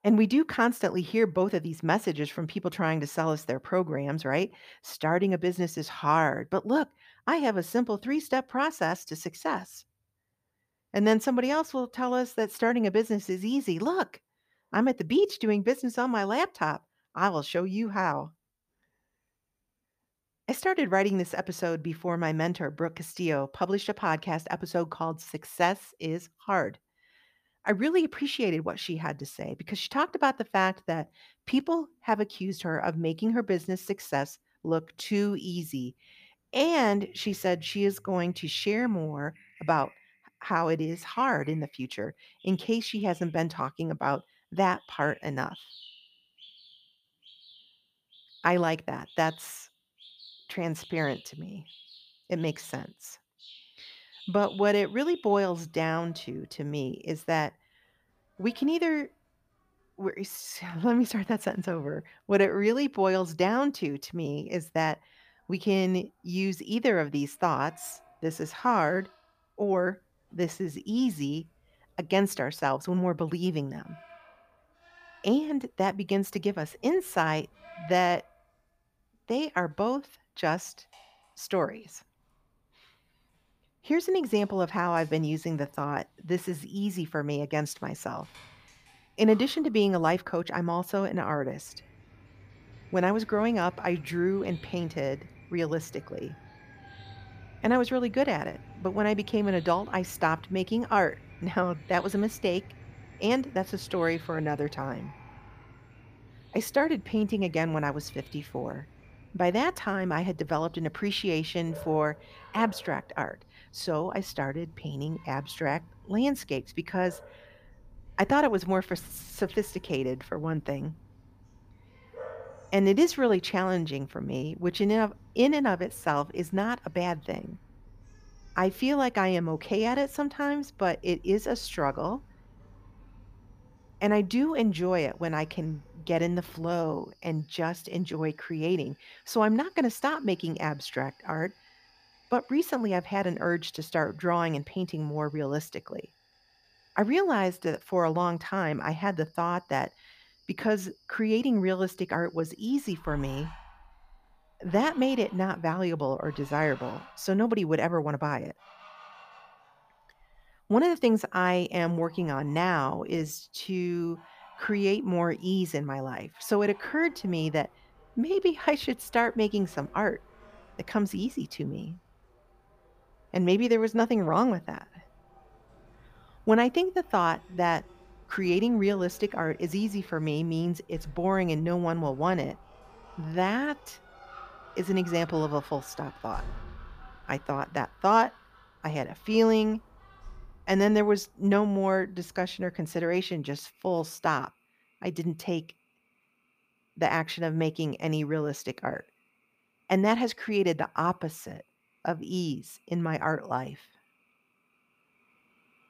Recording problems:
animal sounds; faint; throughout; 25 dB below the speech

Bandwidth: 15 kHz